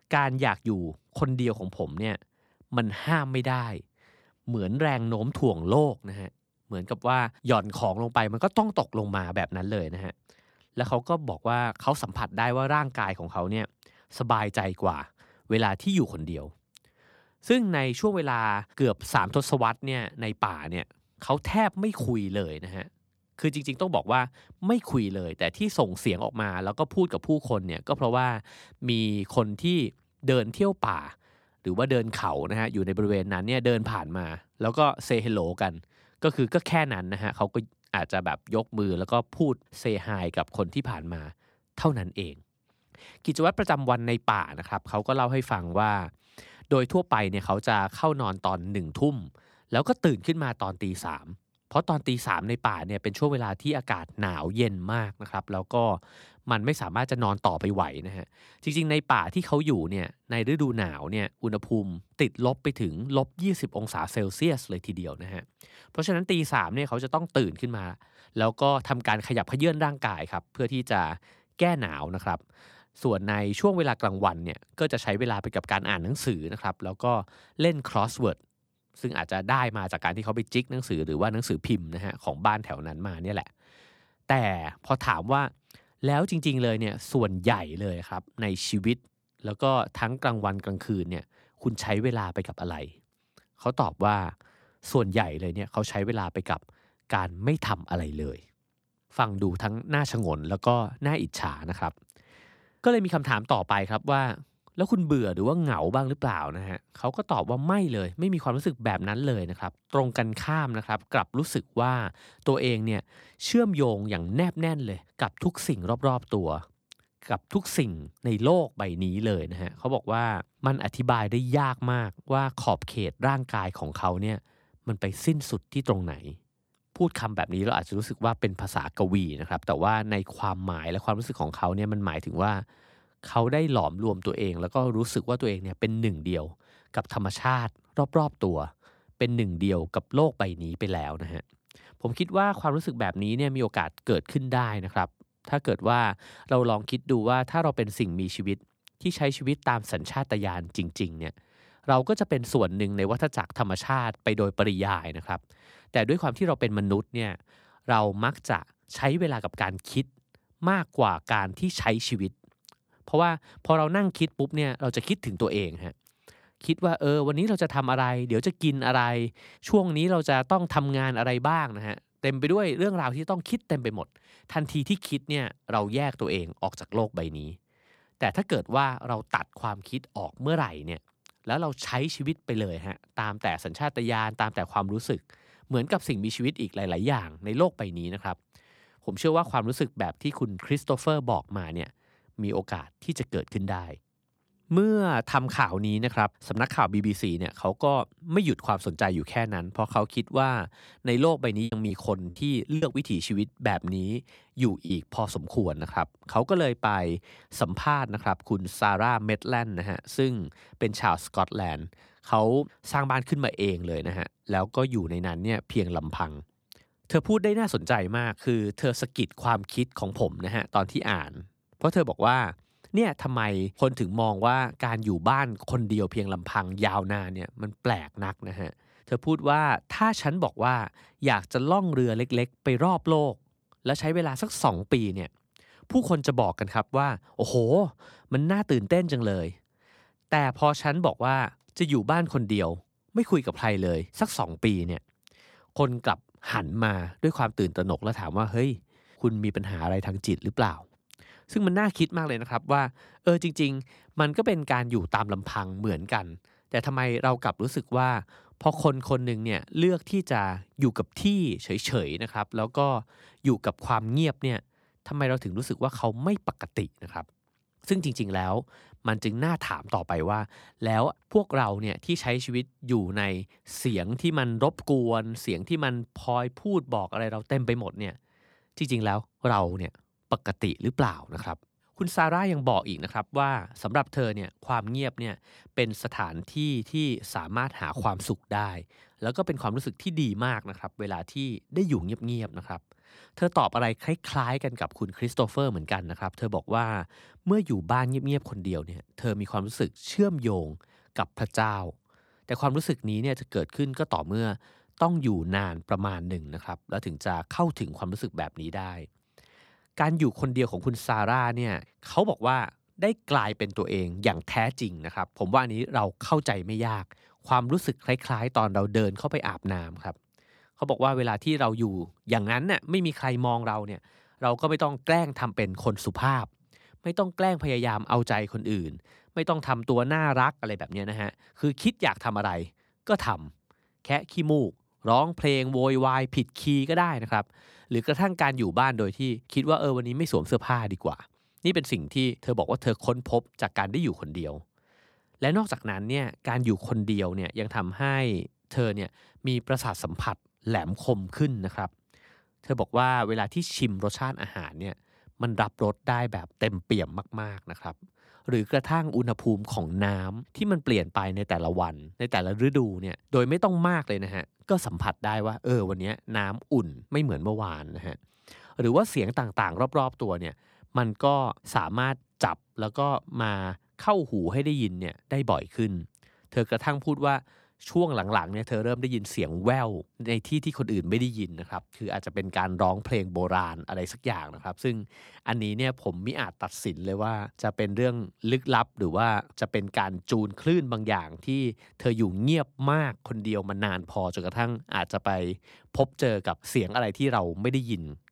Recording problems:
choppy; very; from 3:22 to 3:25; 9% of the speech affected

